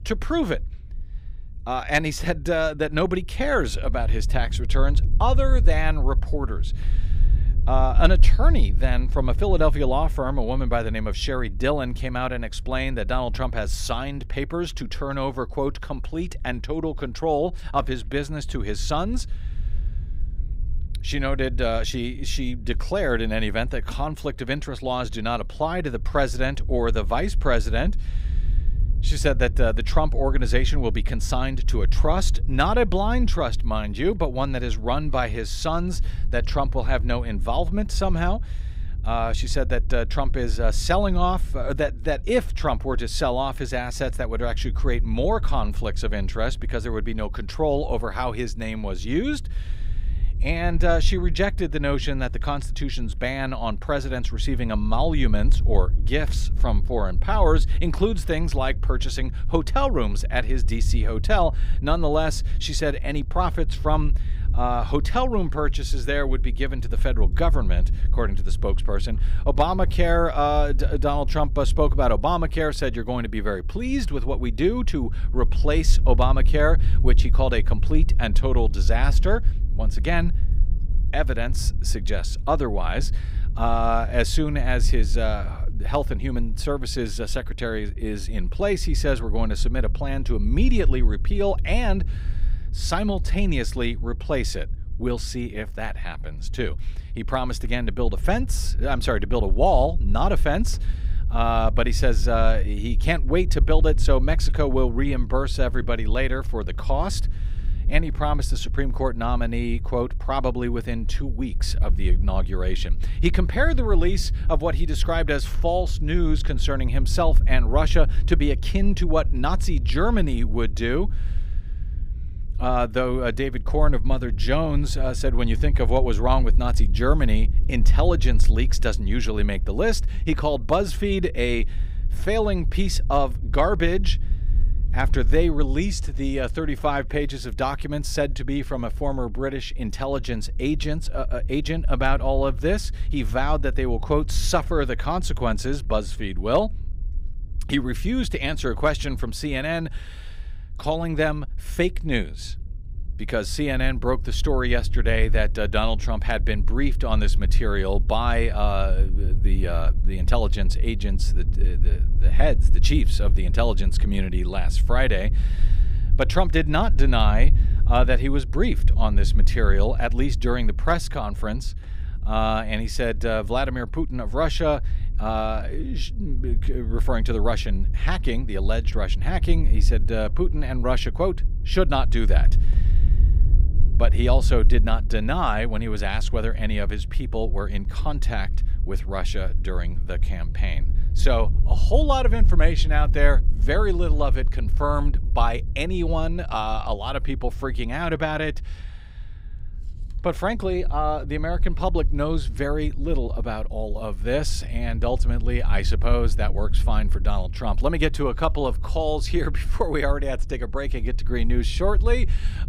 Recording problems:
low rumble; faint; throughout; 20 dB below the speech

